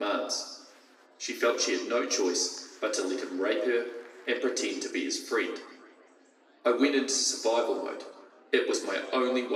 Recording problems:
off-mic speech; far
room echo; noticeable; dies away in 0.9 s
thin; very slightly; fading below 250 Hz
murmuring crowd; faint; throughout; 30 dB below the speech
abrupt cut into speech; at the start and the end

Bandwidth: 15.5 kHz